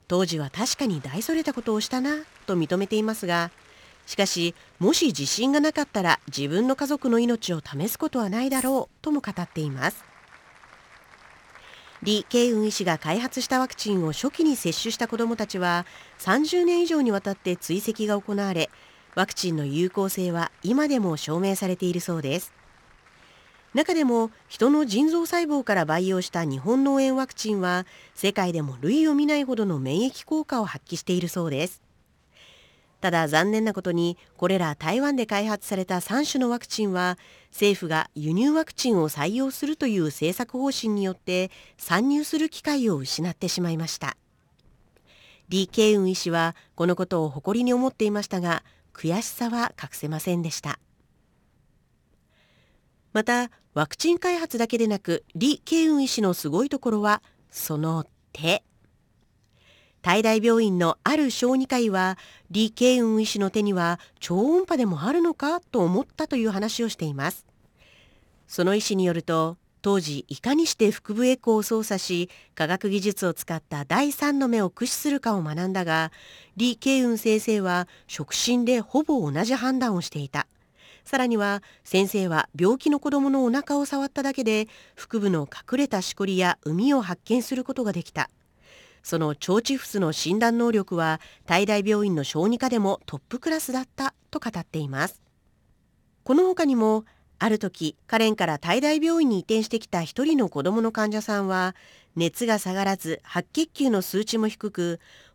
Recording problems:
crowd noise; faint; throughout; 30 dB below the speech
jangling keys; noticeable; at 8.5 s; peak 7 dB below the speech

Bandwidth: 18.5 kHz